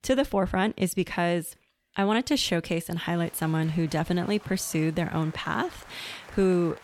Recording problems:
crowd noise; faint; from 3 s on; 20 dB below the speech

